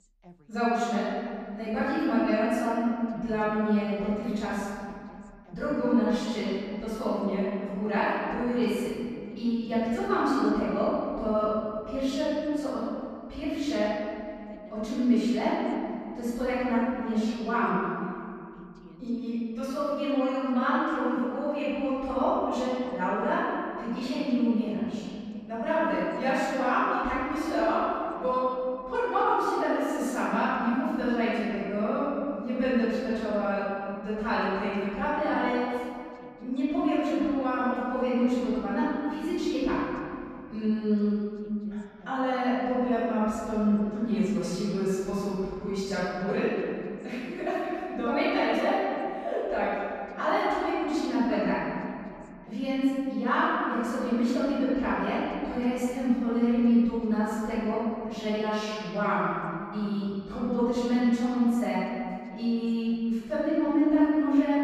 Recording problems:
room echo; strong; dies away in 2.7 s
off-mic speech; far
voice in the background; faint; throughout; 30 dB below the speech

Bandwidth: 14.5 kHz